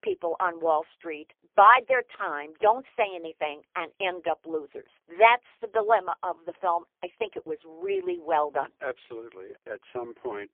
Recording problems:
phone-call audio; poor line; nothing above 3.5 kHz

